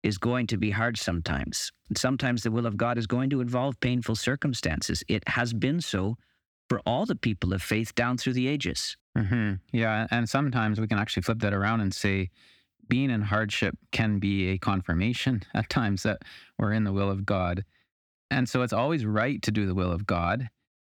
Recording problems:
none

